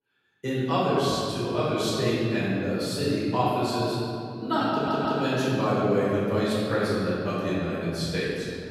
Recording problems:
room echo; strong; dies away in 3 s
off-mic speech; far
audio stuttering; at 4.5 s

